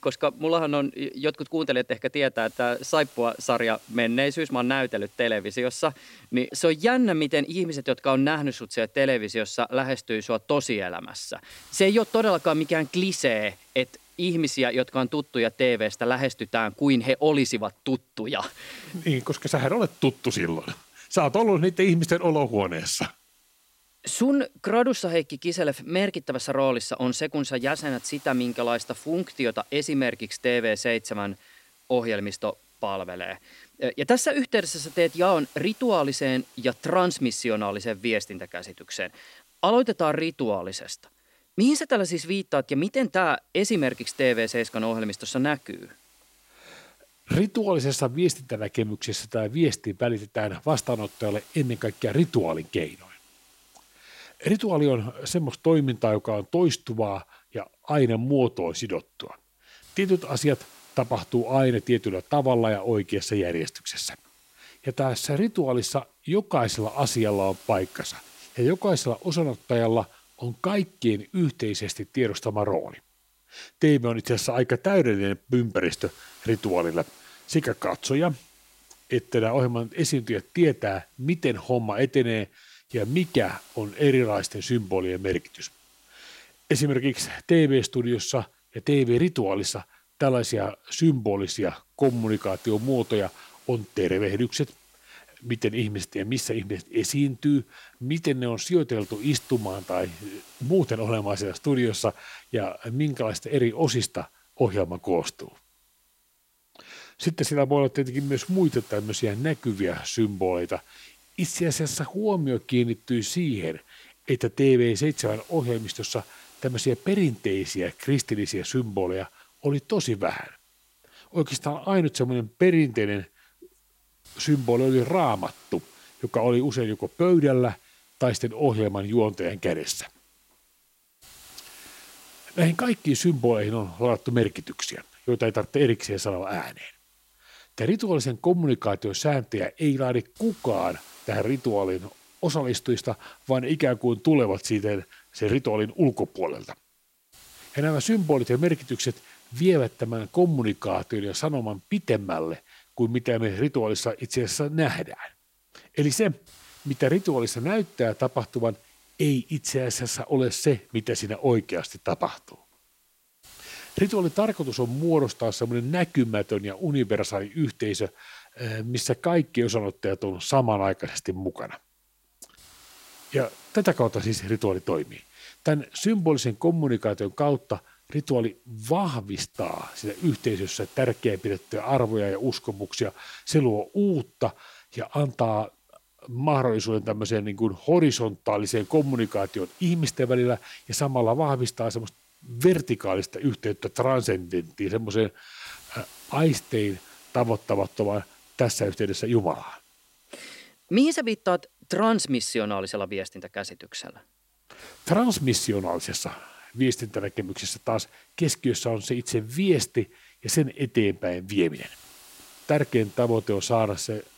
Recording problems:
hiss; faint; throughout; 25 dB below the speech

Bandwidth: 16 kHz